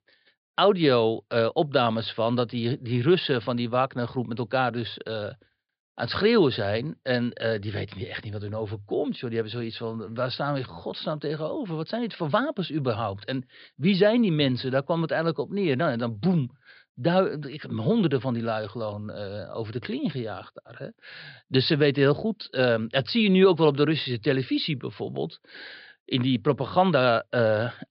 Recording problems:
high frequencies cut off; severe; nothing above 5 kHz

